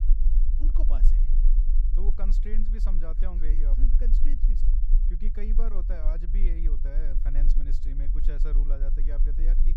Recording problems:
low rumble; loud; throughout; 7 dB below the speech

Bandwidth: 15.5 kHz